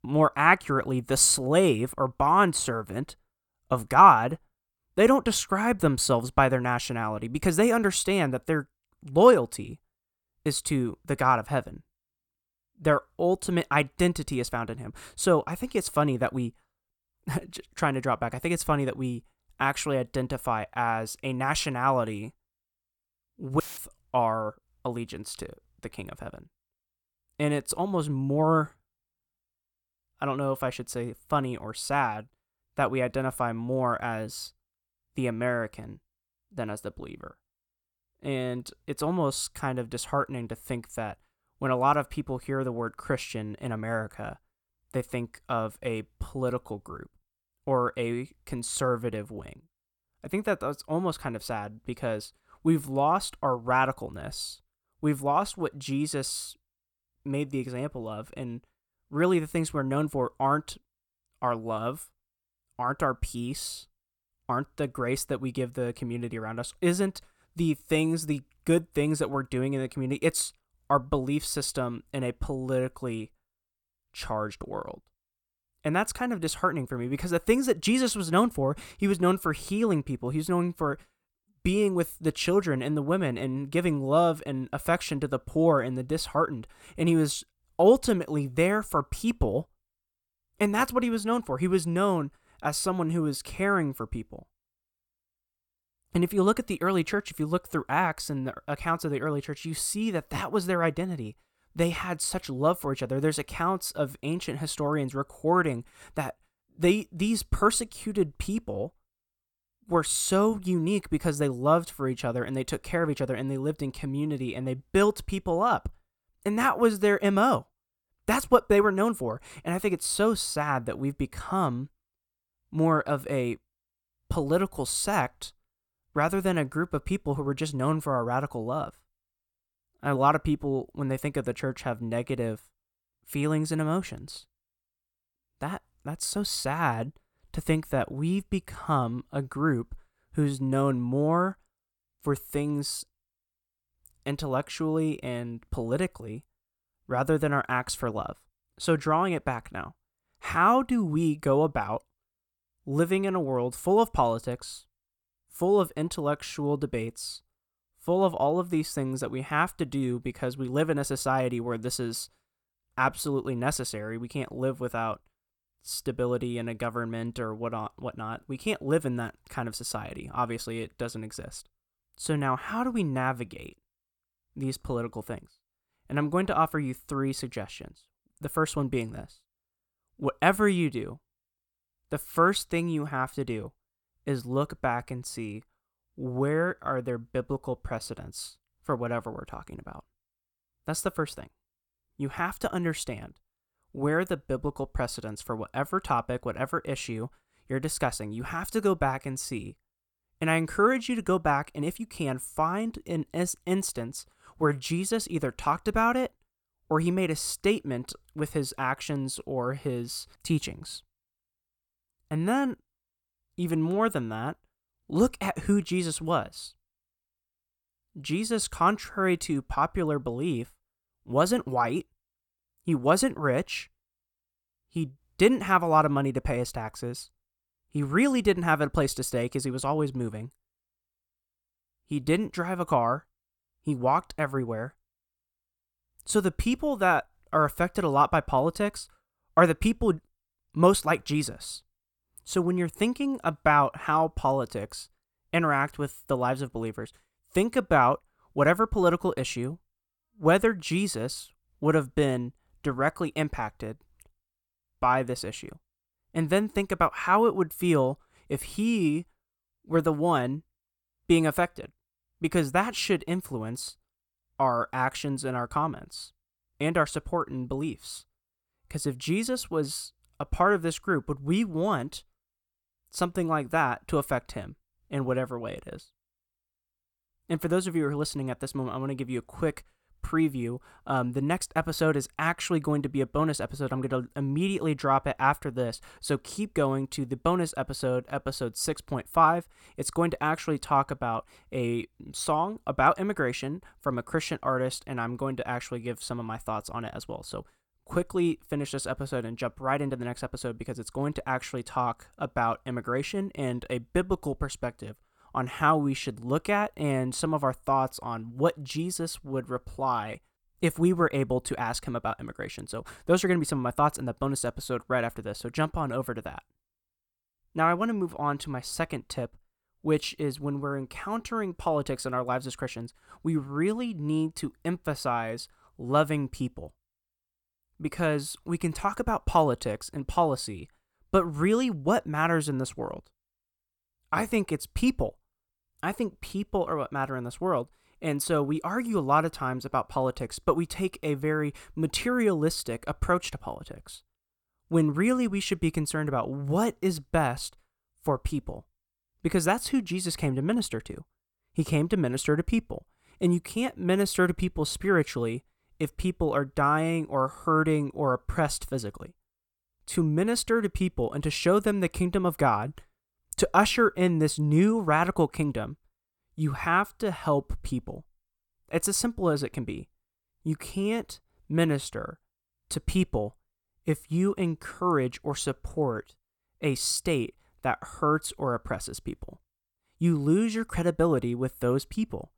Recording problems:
audio cutting out; filled with static; at 24 s

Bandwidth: 18 kHz